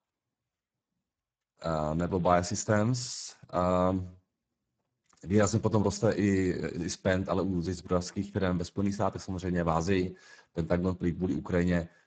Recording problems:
garbled, watery; badly; nothing above 7.5 kHz

